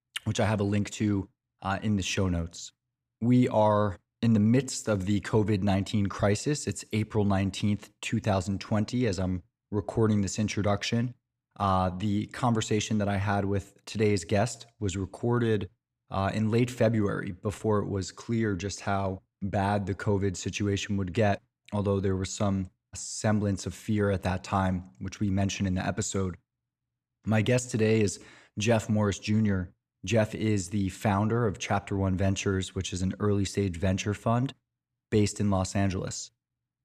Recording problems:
none

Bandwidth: 14.5 kHz